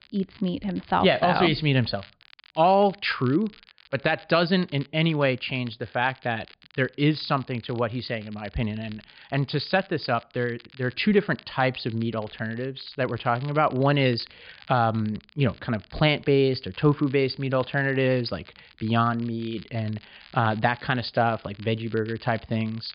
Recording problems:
high frequencies cut off; severe; nothing above 5 kHz
crackle, like an old record; faint; 25 dB below the speech

